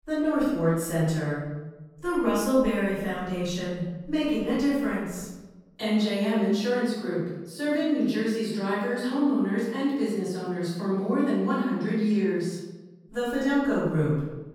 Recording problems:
room echo; strong; dies away in 1 s
off-mic speech; far

